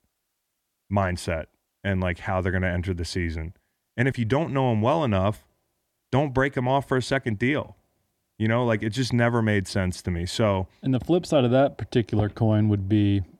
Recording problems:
none

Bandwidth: 17 kHz